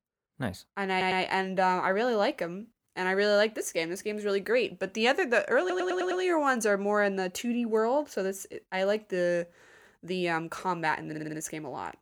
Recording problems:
audio stuttering; at 1 s, at 5.5 s and at 11 s

